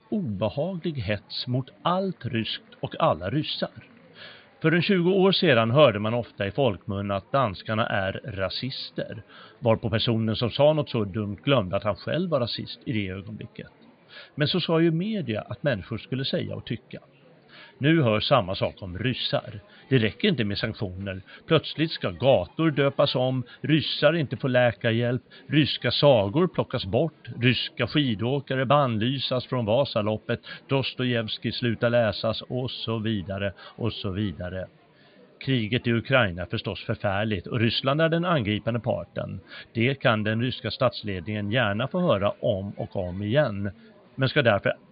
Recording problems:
high frequencies cut off; severe; nothing above 4.5 kHz
murmuring crowd; faint; throughout; 30 dB below the speech

